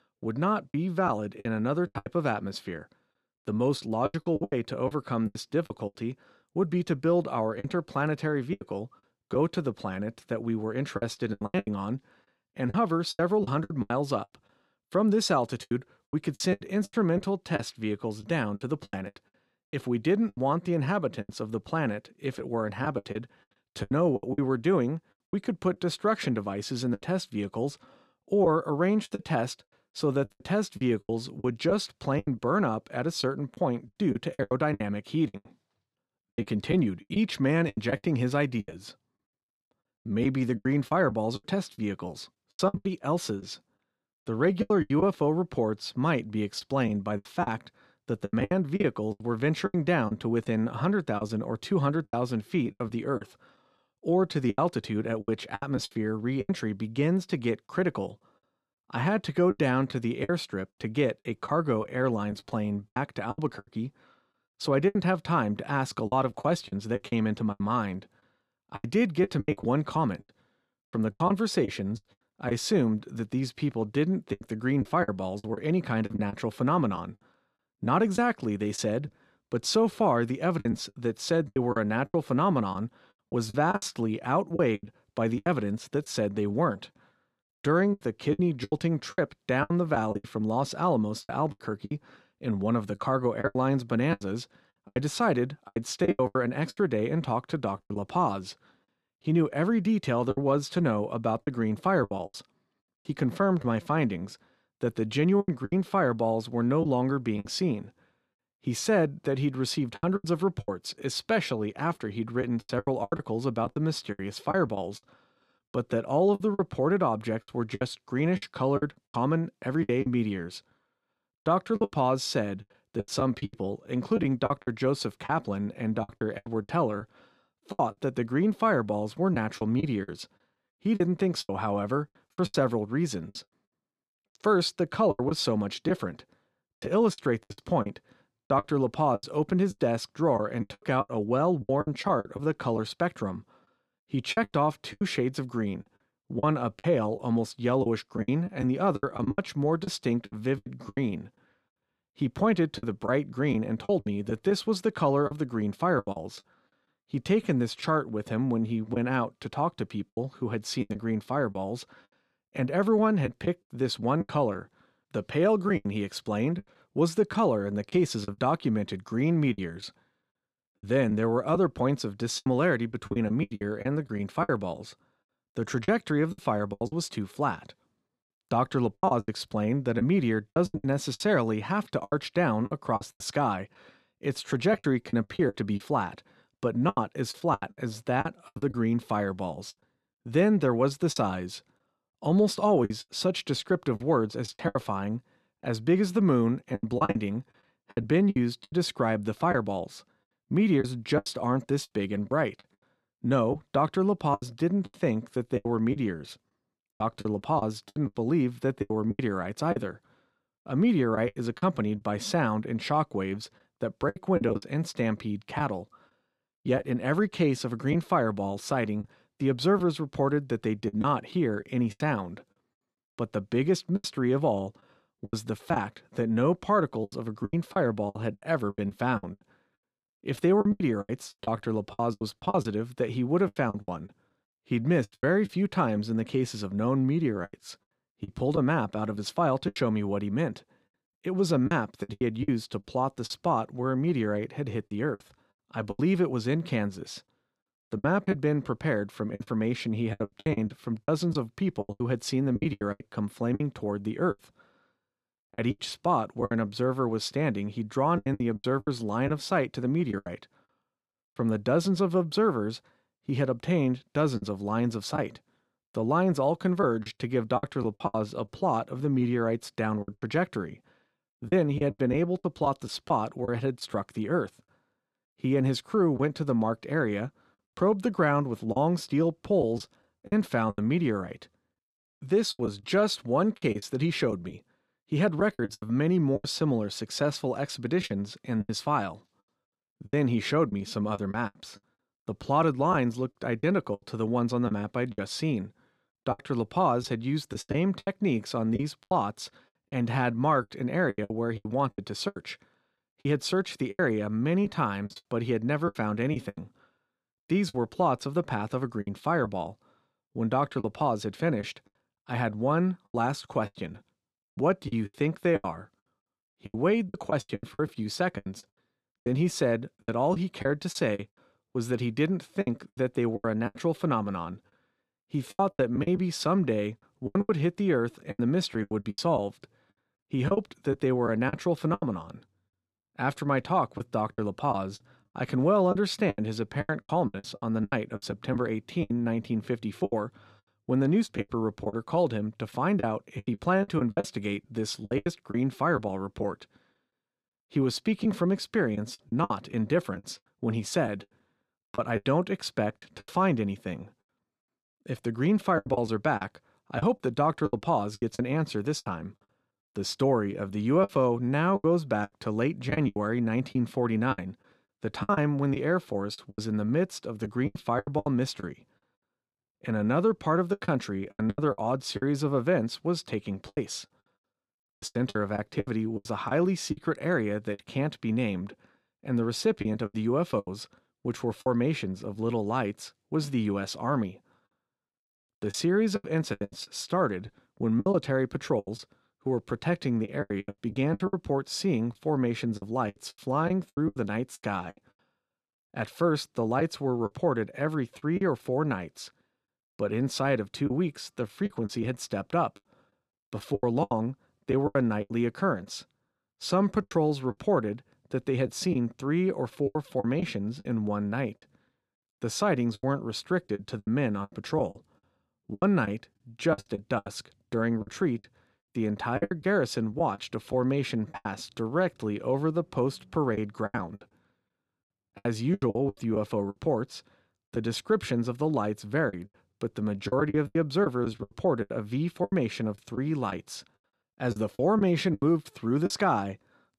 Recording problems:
choppy; very; 11% of the speech affected

